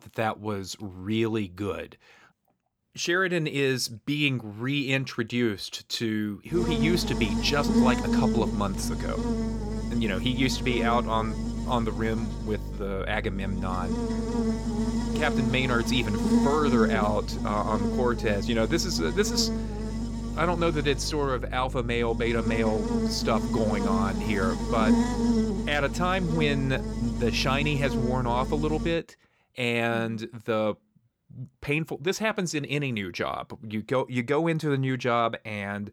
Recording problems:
electrical hum; loud; from 6.5 to 29 s; 50 Hz, 6 dB below the speech

